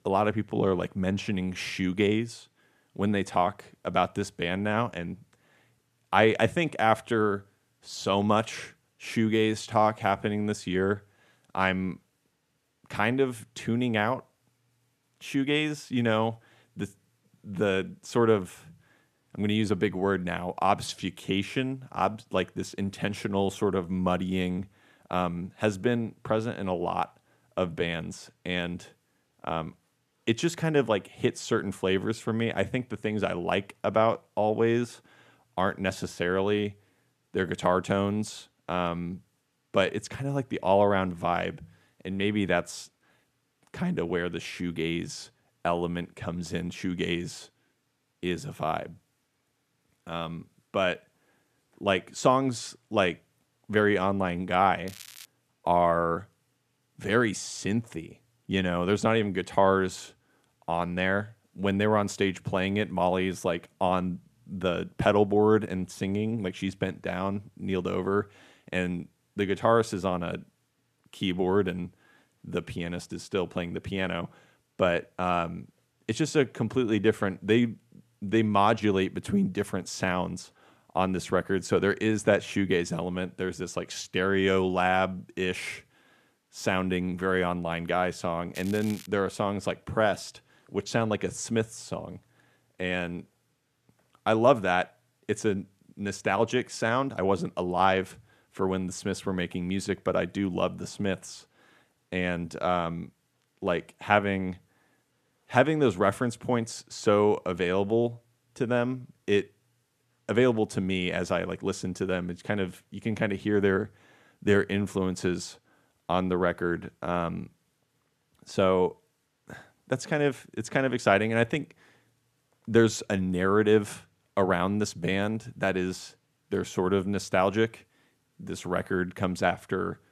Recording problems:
crackling; noticeable; at 55 s and at 1:29; 20 dB below the speech

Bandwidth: 14.5 kHz